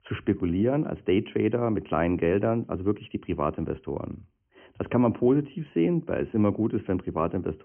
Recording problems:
high frequencies cut off; severe; nothing above 3 kHz

